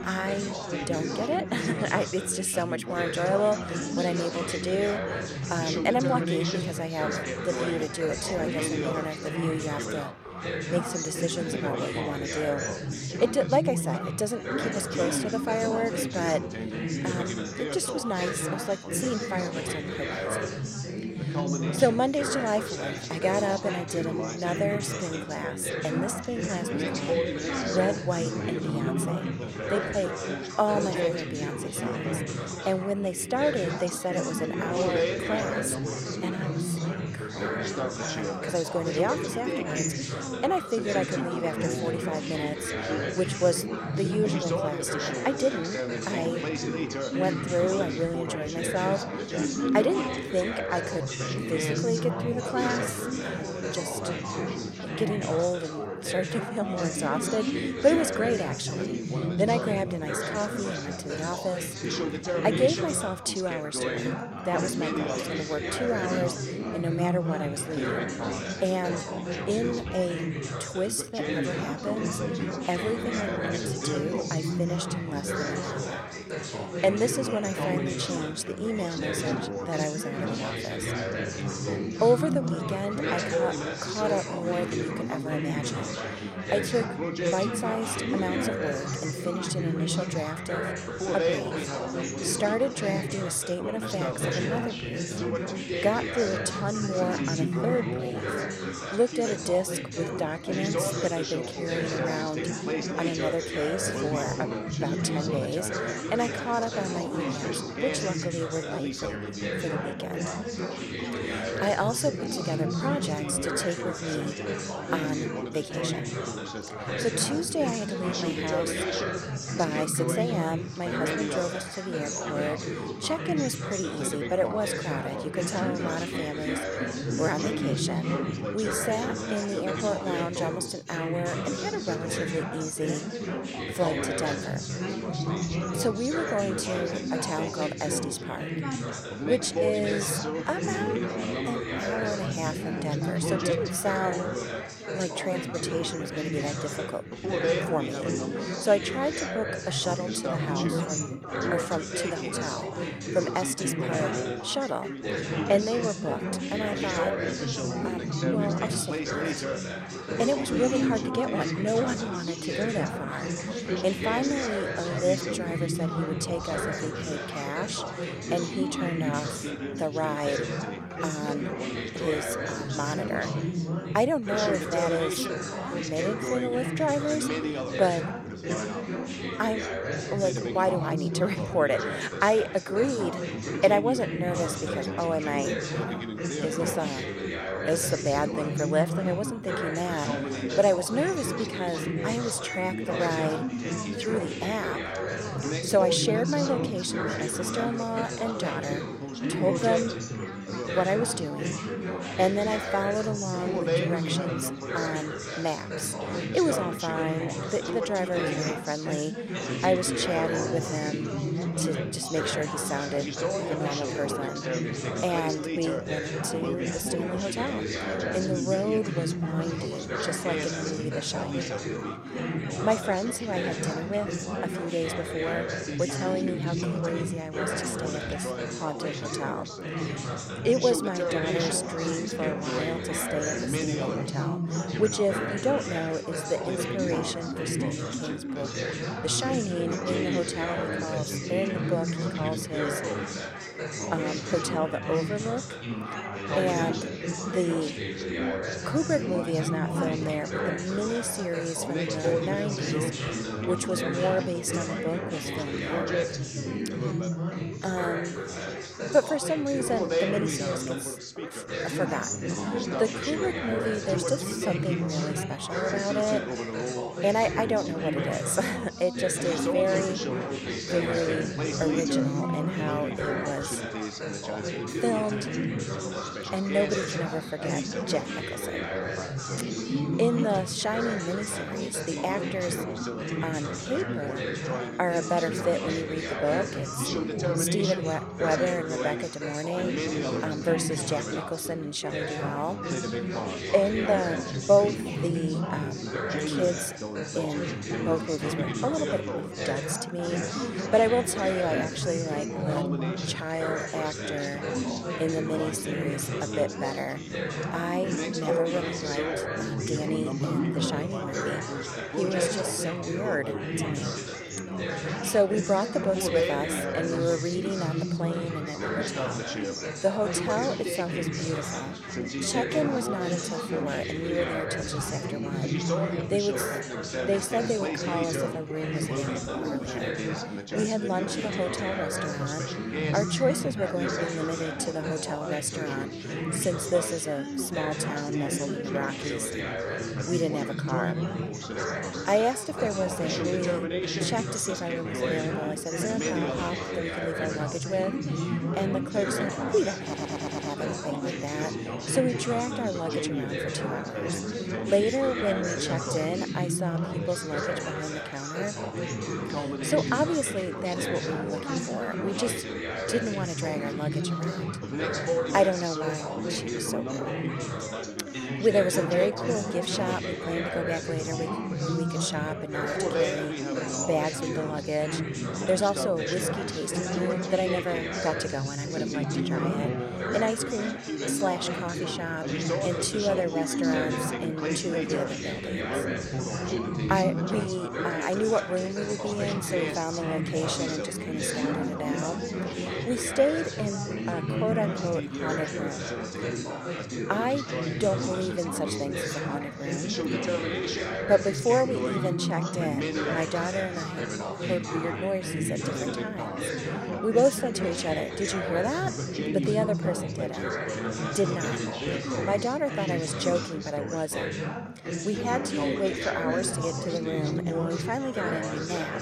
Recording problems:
chatter from many people; loud; throughout; 1 dB below the speech
audio stuttering; at 5:50

